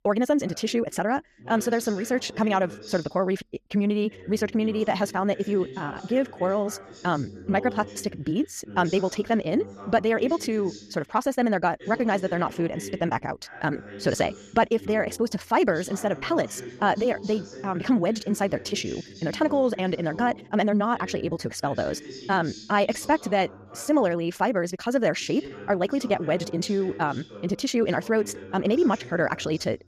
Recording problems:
wrong speed, natural pitch; too fast; 1.6 times normal speed
voice in the background; noticeable; throughout; 15 dB below the speech

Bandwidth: 14.5 kHz